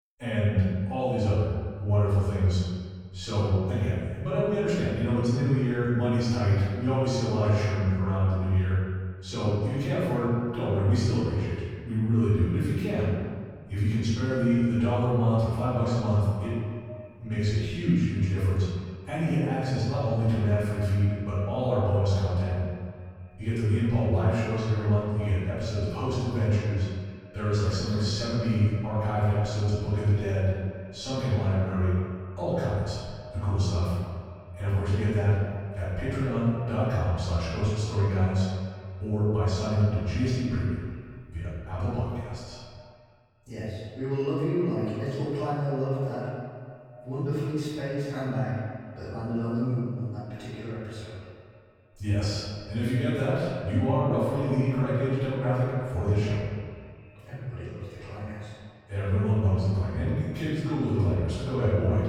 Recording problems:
room echo; strong; dies away in 1.6 s
off-mic speech; far
echo of what is said; faint; from 16 s on; 260 ms later, 20 dB below the speech

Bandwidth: 18.5 kHz